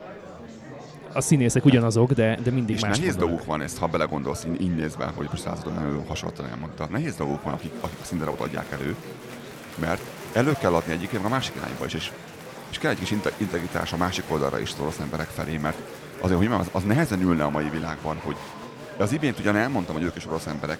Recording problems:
murmuring crowd; noticeable; throughout; 15 dB below the speech

